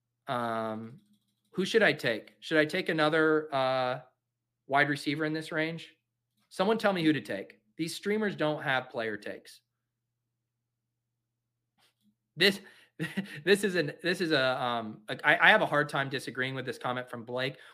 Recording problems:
none

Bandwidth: 15 kHz